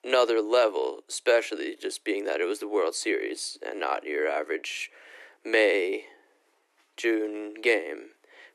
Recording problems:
thin; very; fading below 300 Hz

